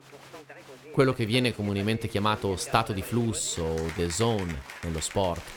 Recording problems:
crowd noise; noticeable; throughout; 15 dB below the speech
uneven, jittery; slightly; from 1 to 5 s

